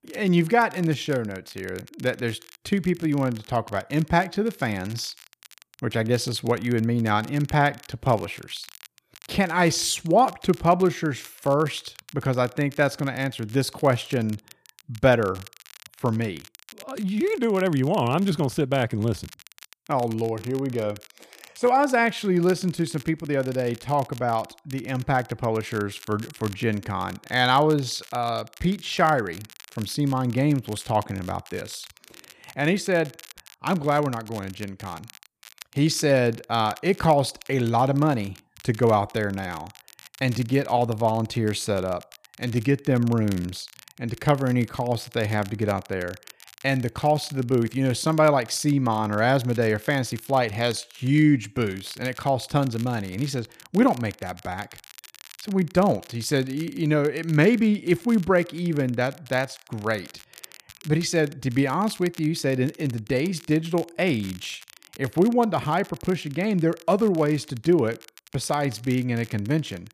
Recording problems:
crackle, like an old record; faint; 20 dB below the speech

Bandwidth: 14.5 kHz